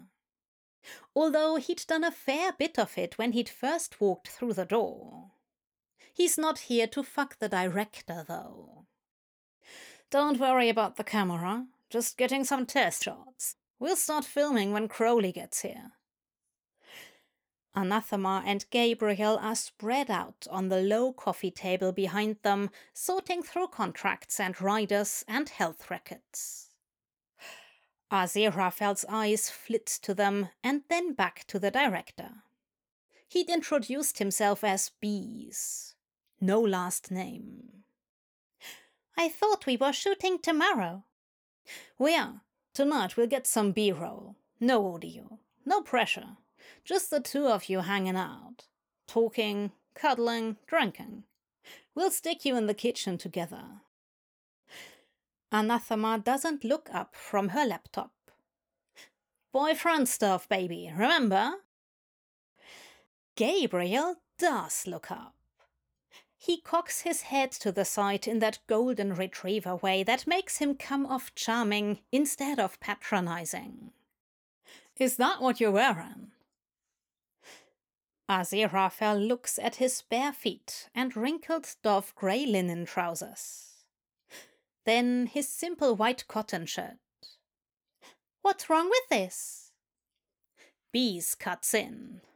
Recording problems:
none

